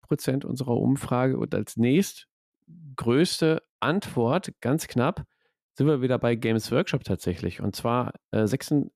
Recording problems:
none

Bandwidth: 14.5 kHz